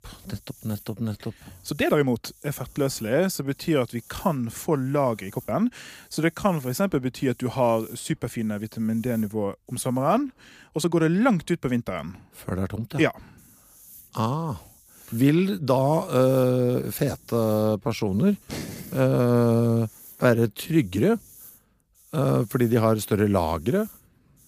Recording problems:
hiss; faint; until 10 s and from 13 s on; 25 dB below the speech
uneven, jittery; strongly; from 0.5 to 21 s

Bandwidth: 15 kHz